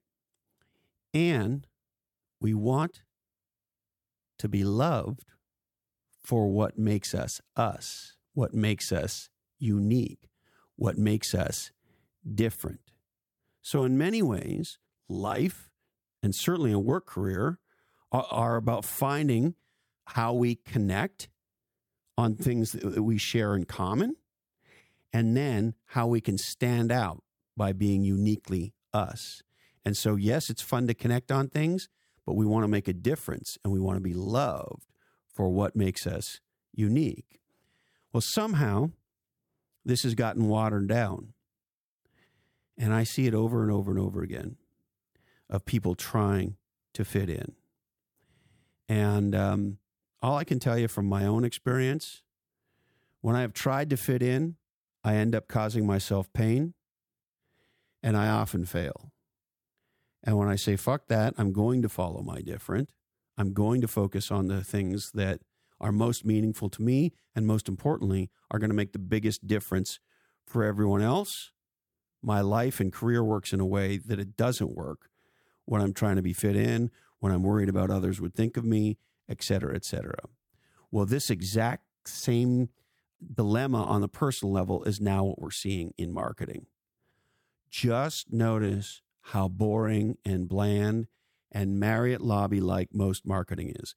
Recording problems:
none

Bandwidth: 17 kHz